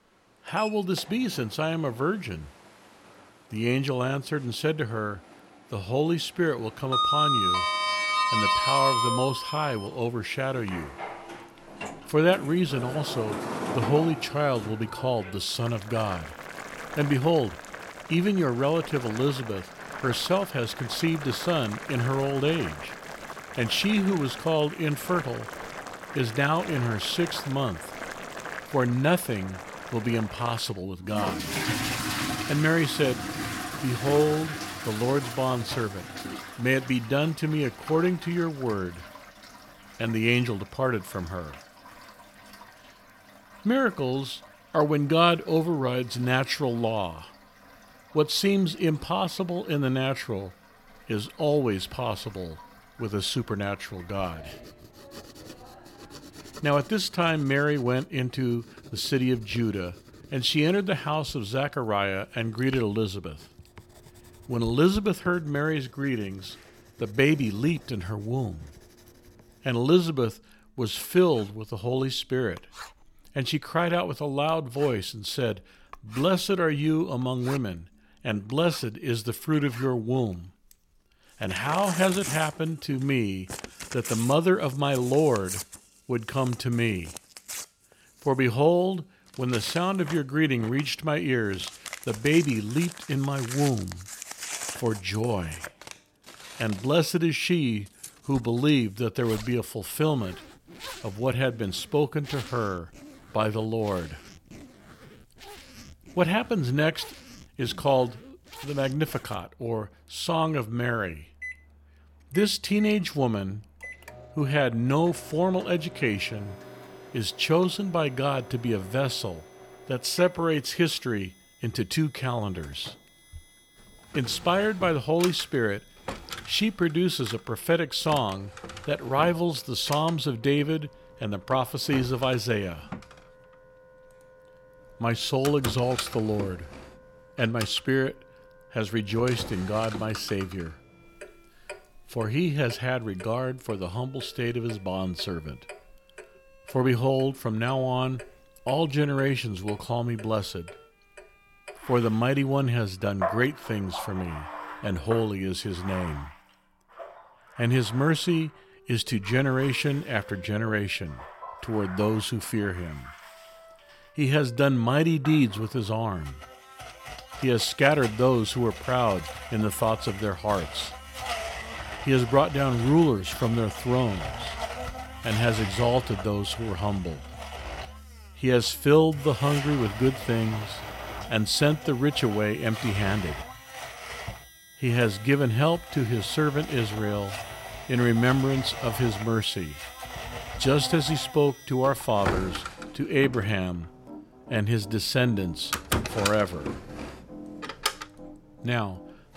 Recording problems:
household noises; loud; throughout; 9 dB below the speech
background music; faint; throughout; 25 dB below the speech

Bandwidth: 16.5 kHz